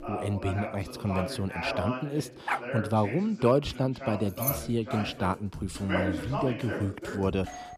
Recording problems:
voice in the background; loud; throughout; 6 dB below the speech
background music; noticeable; throughout; 20 dB below the speech
dog barking; noticeable; at 2.5 s; peak 2 dB below the speech
jangling keys; noticeable; at 4.5 s; peak 1 dB below the speech
doorbell; very faint; at 7.5 s; peak 15 dB below the speech

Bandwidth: 14.5 kHz